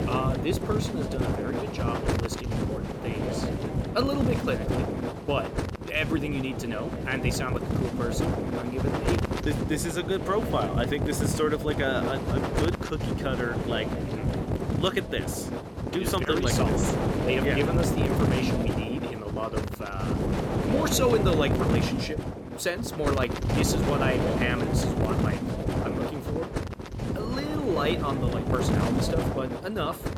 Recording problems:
wind noise on the microphone; heavy; 1 dB below the speech

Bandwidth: 17.5 kHz